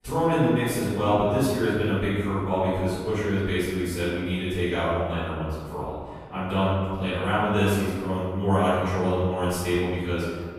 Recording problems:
room echo; strong; dies away in 1.6 s
off-mic speech; far

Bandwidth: 14.5 kHz